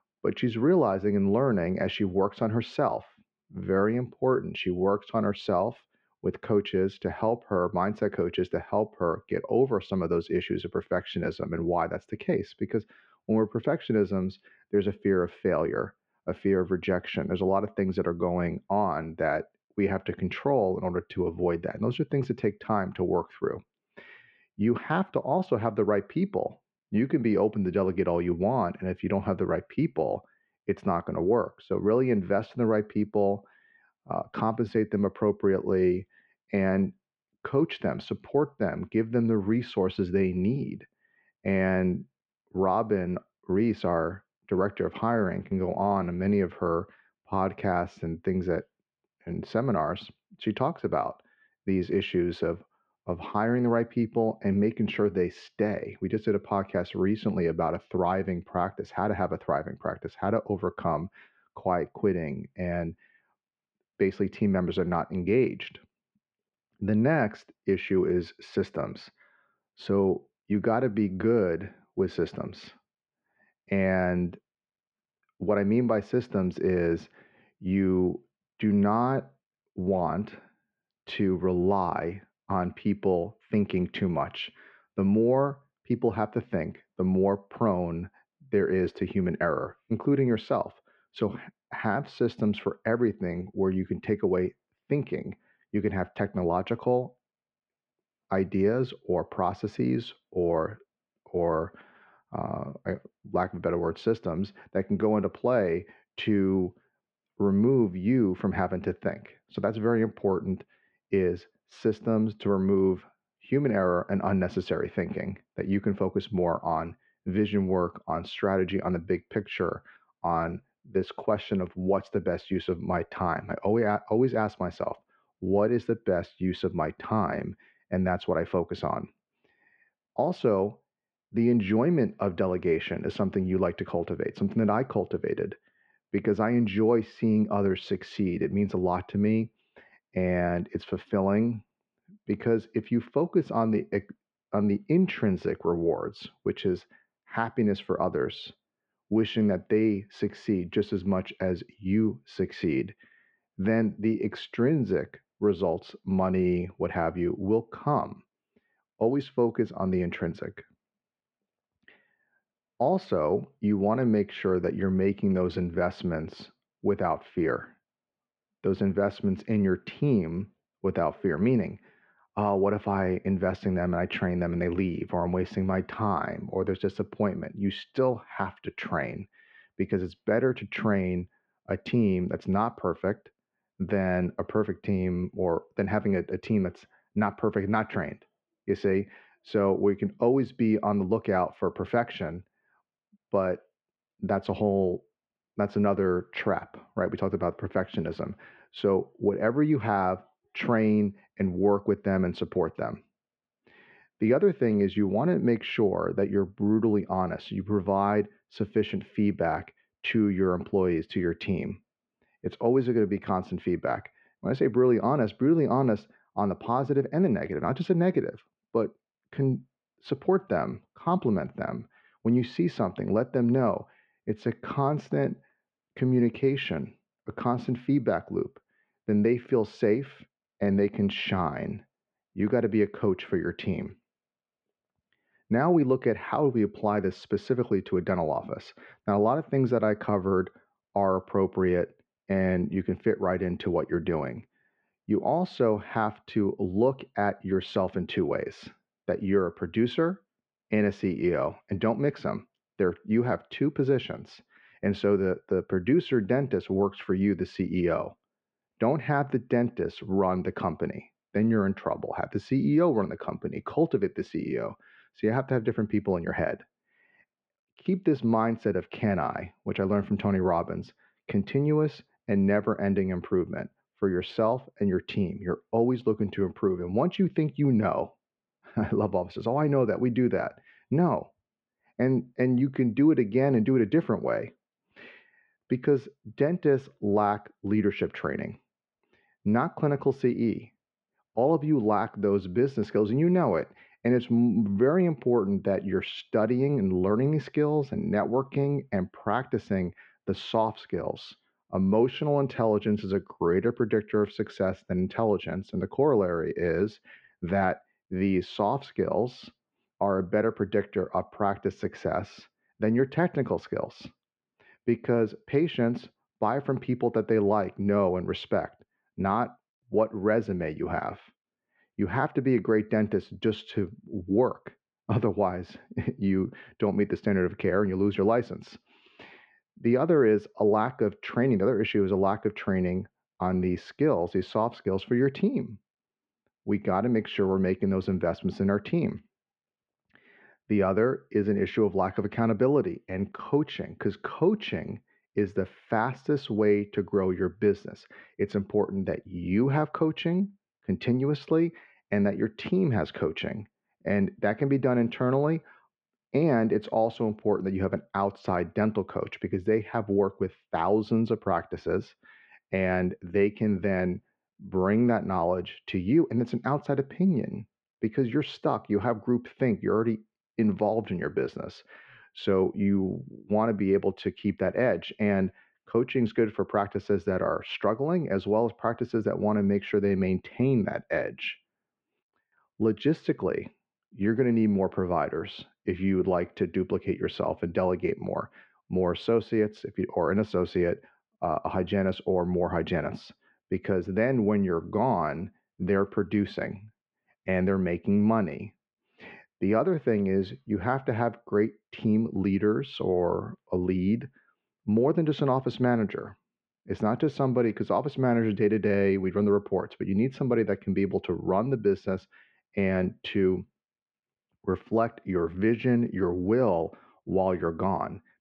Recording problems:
muffled; very; fading above 2.5 kHz

